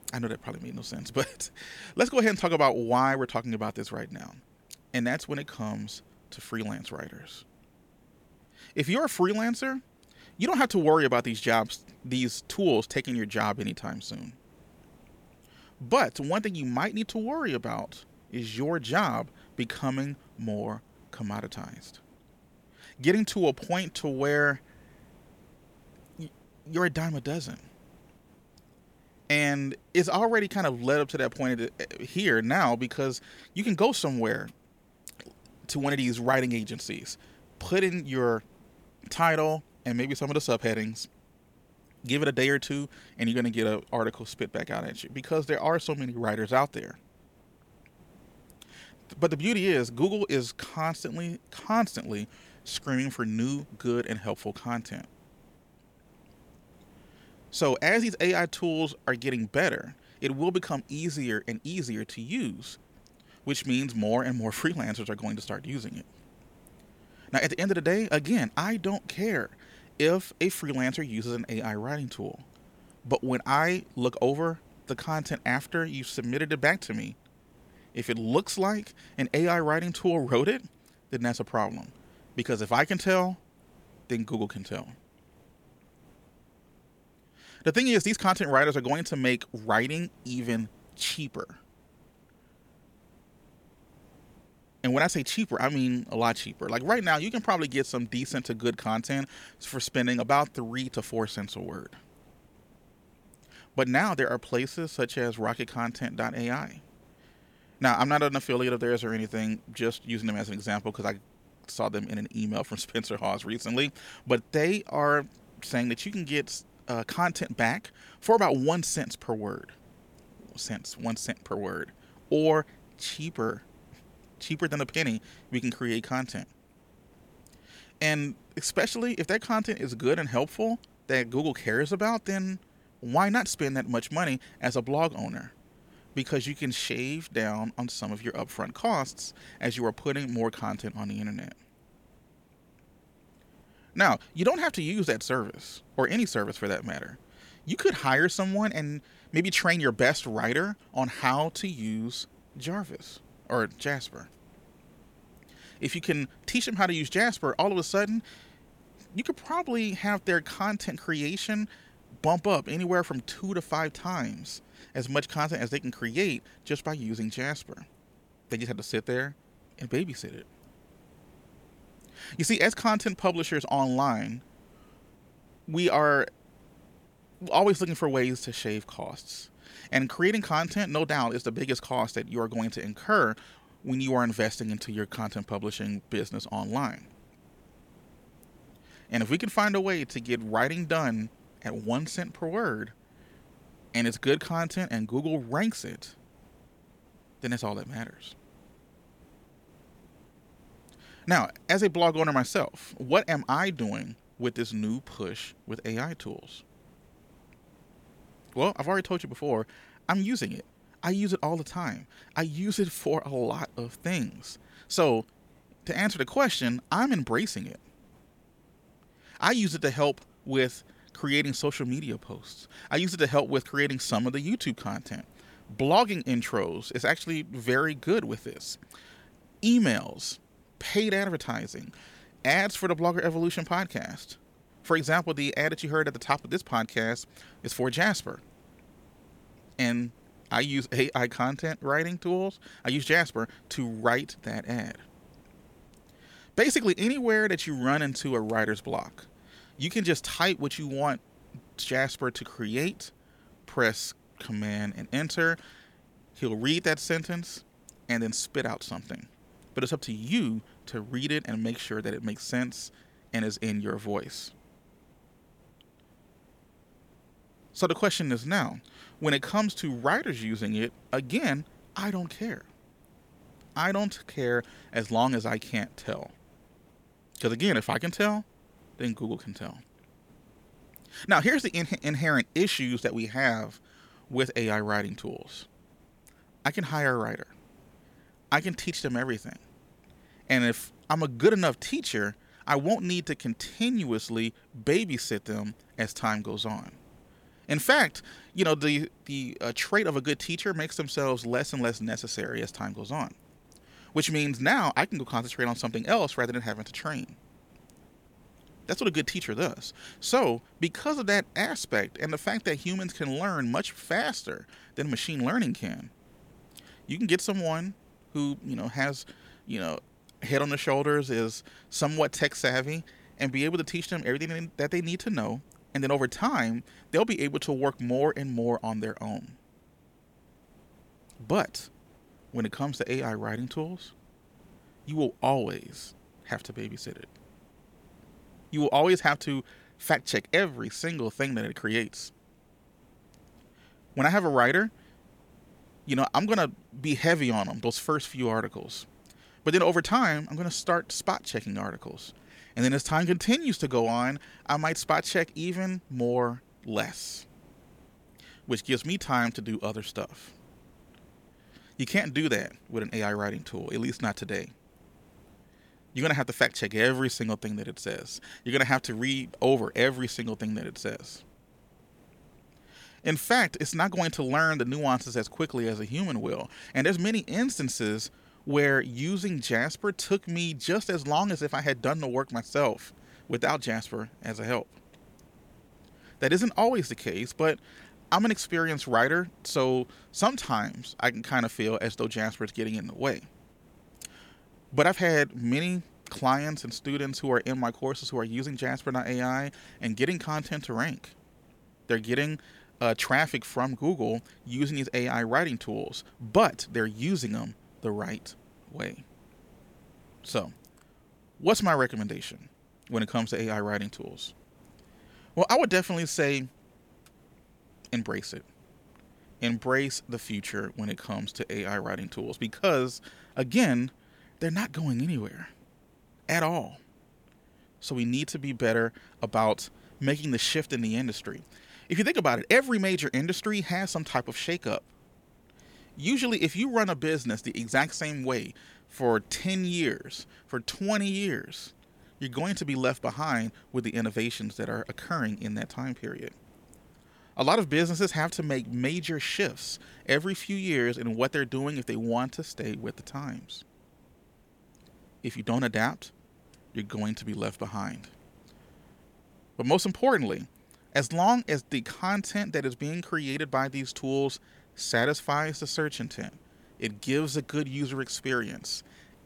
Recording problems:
hiss; faint; throughout; 30 dB below the speech

